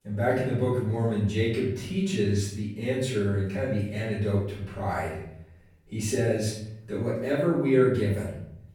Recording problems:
off-mic speech; far
room echo; noticeable; dies away in 0.9 s

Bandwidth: 18 kHz